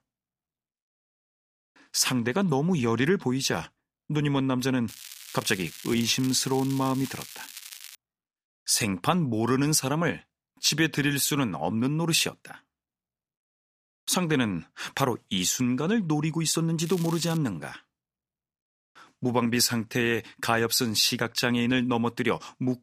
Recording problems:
crackling; noticeable; from 5 to 8 s and at 17 s; 15 dB below the speech

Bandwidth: 15 kHz